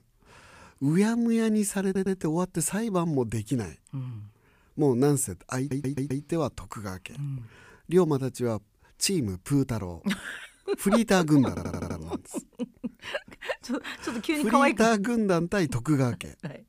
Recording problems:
audio stuttering; at 2 s, at 5.5 s and at 11 s

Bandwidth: 15 kHz